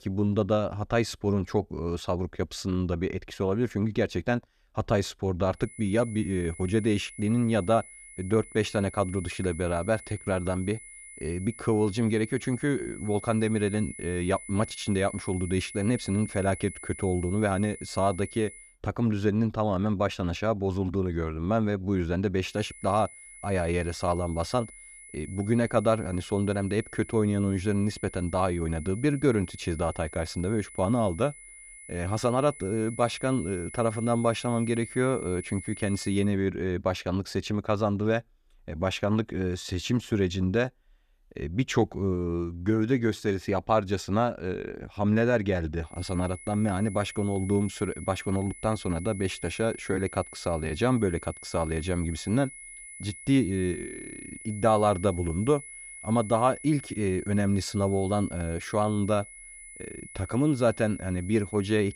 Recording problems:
high-pitched whine; noticeable; from 5.5 to 19 s, from 23 to 36 s and from 46 s on; 2 kHz, 15 dB below the speech

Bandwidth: 14.5 kHz